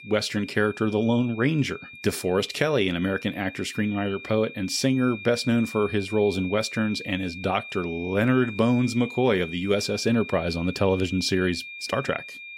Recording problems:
high-pitched whine; noticeable; throughout; 2.5 kHz, 15 dB below the speech

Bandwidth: 16 kHz